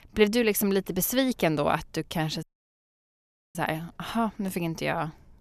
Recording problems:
audio cutting out; at 2.5 s for 1 s

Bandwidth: 14 kHz